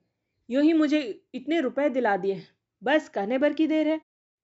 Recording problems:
high frequencies cut off; noticeable; nothing above 8 kHz

